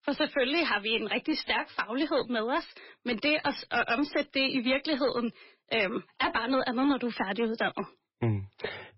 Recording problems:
garbled, watery; badly; nothing above 5.5 kHz
distortion; slight; 8% of the sound clipped

